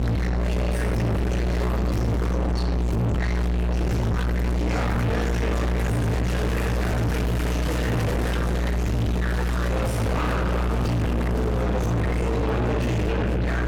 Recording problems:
distortion; heavy; 5 dB below the speech
off-mic speech; far
room echo; noticeable; dies away in 1.8 s
electrical hum; loud; throughout; 60 Hz, 2 dB below the speech
chatter from many people; loud; throughout; 3 dB below the speech
background music; noticeable; throughout; 20 dB below the speech

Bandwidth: 18.5 kHz